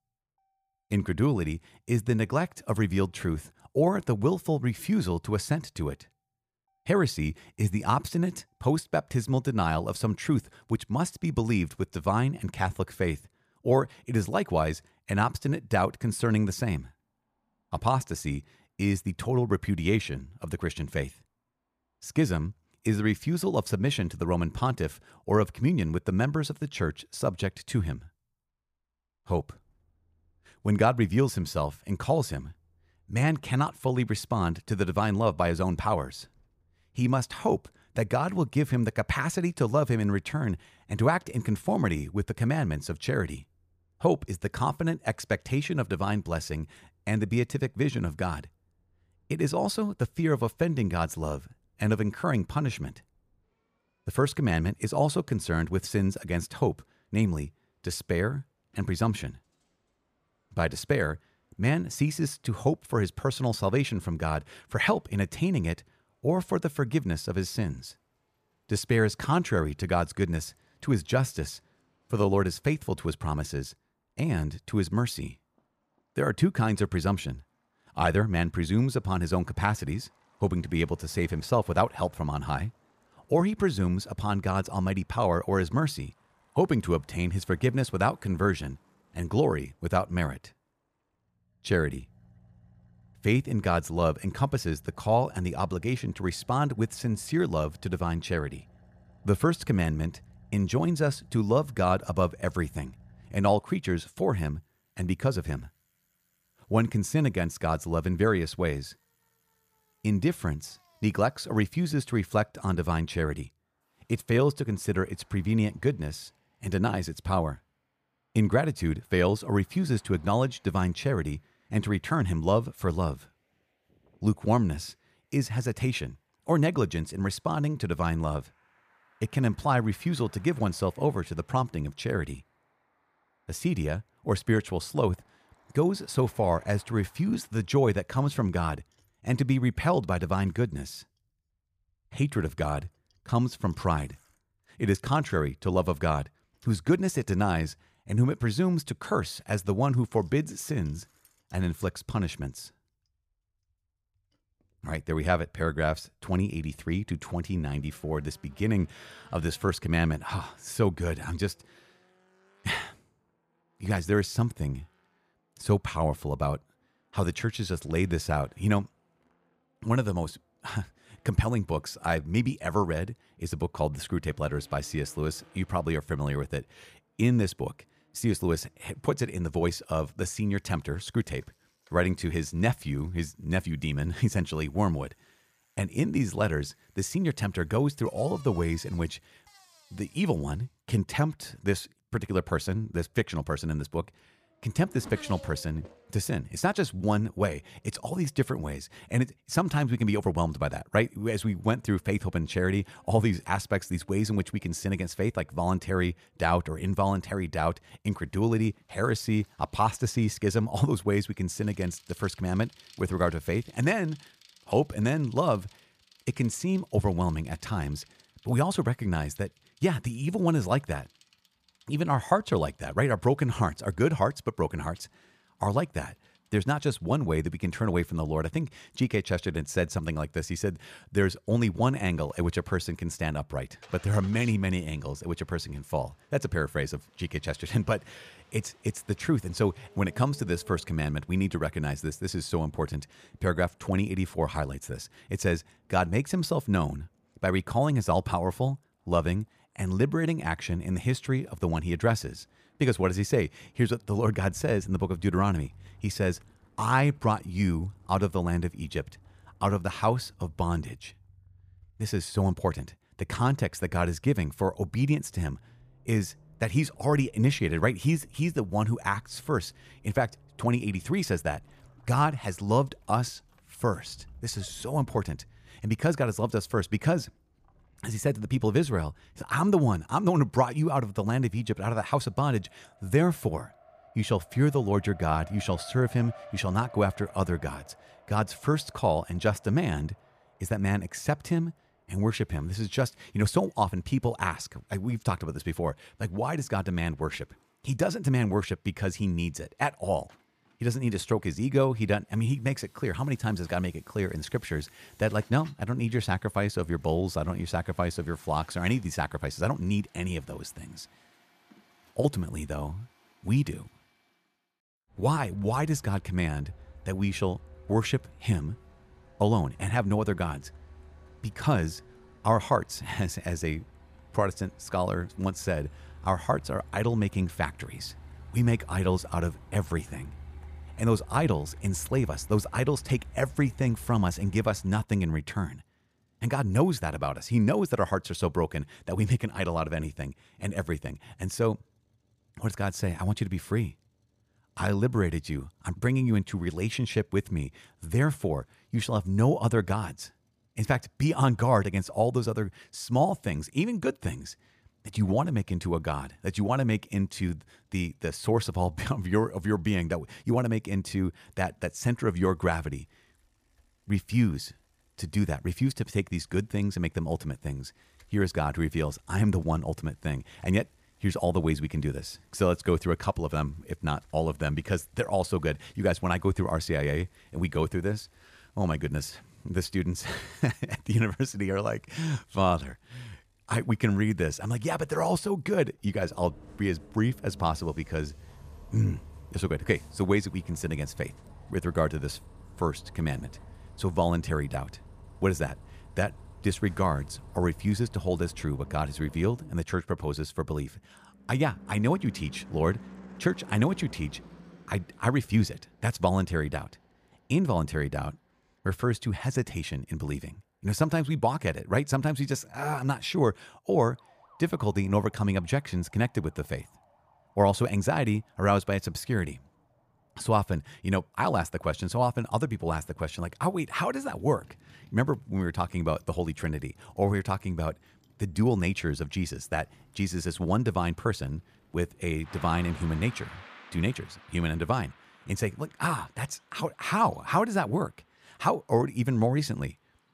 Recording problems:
traffic noise; faint; throughout; 25 dB below the speech

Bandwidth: 14.5 kHz